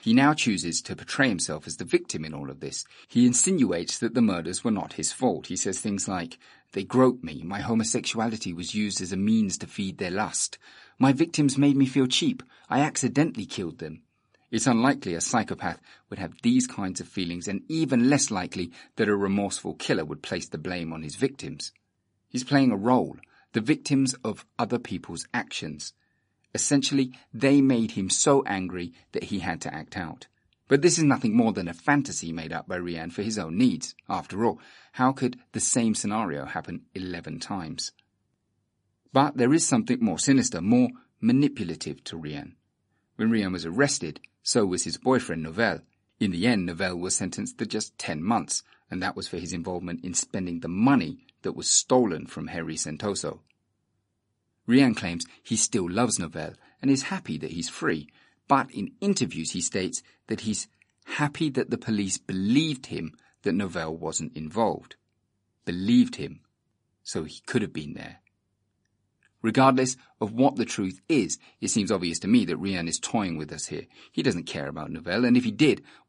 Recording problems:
garbled, watery; slightly; nothing above 9 kHz

